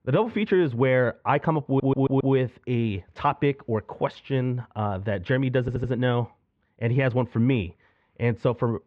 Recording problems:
muffled; very; fading above 2.5 kHz
audio stuttering; at 1.5 s and at 5.5 s

